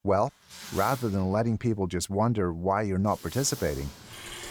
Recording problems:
household noises; noticeable; throughout; 15 dB below the speech

